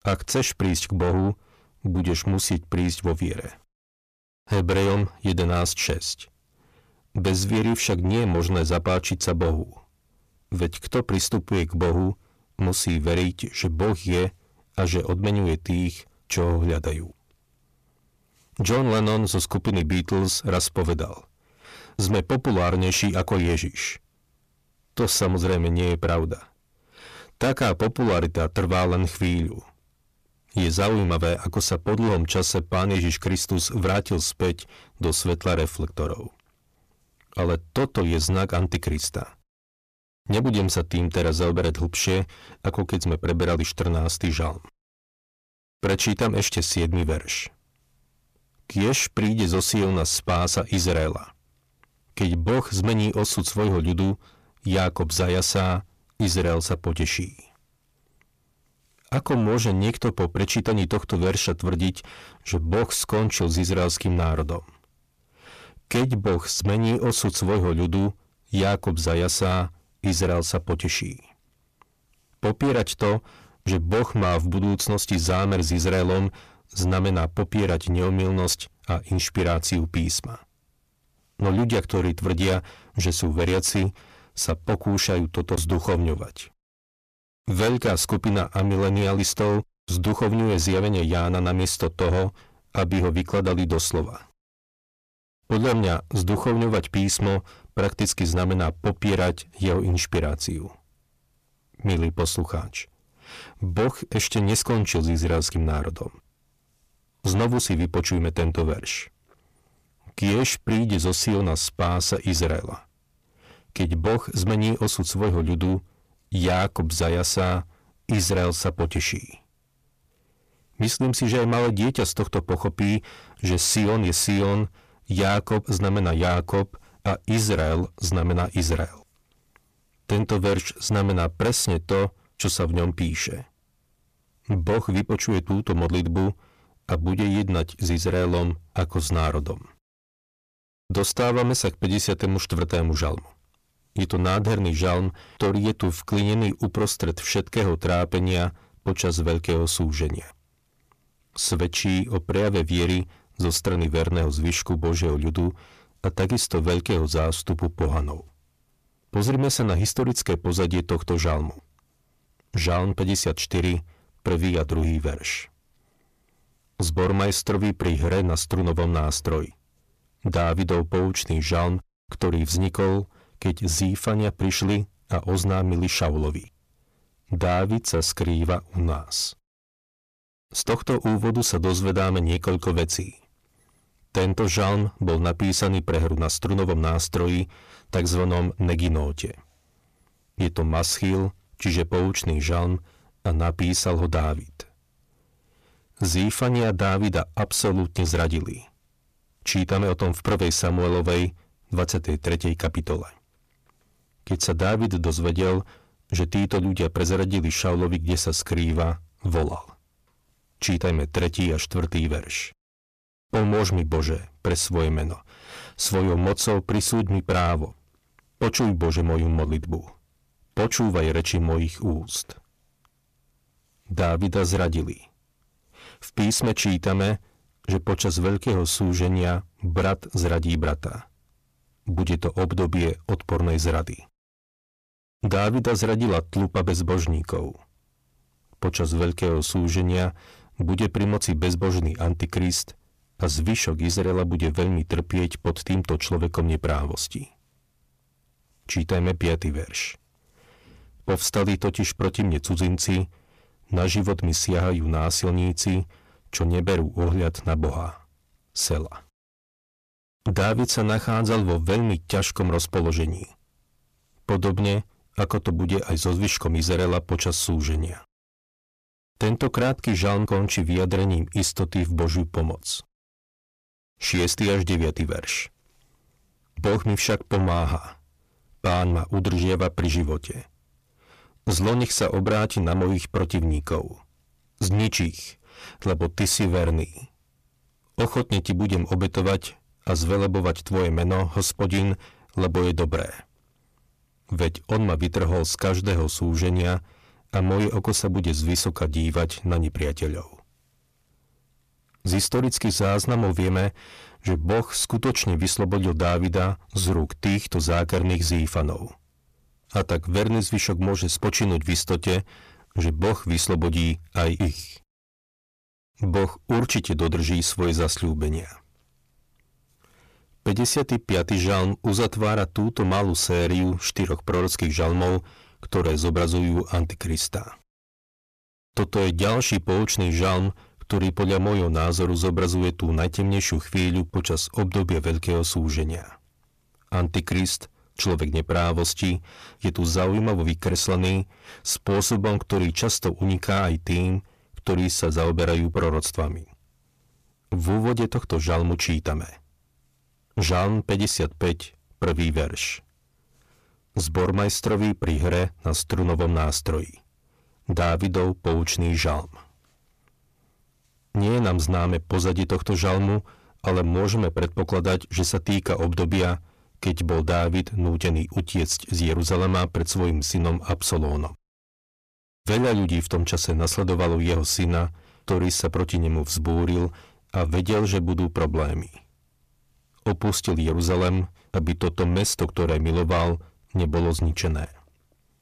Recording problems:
distortion; heavy; 8 dB below the speech

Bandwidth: 14.5 kHz